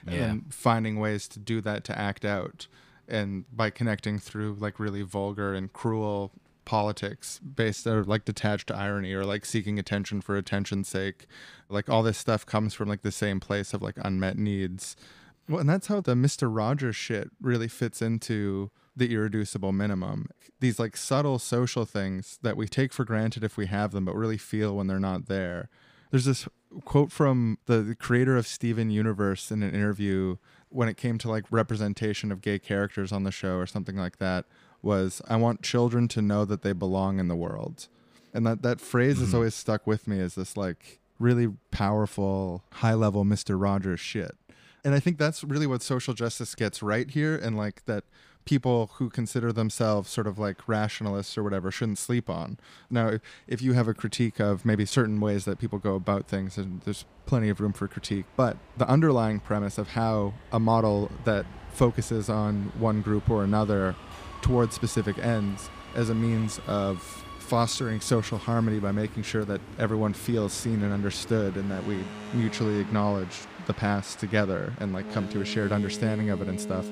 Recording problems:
train or aircraft noise; noticeable; throughout; 15 dB below the speech

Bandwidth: 15 kHz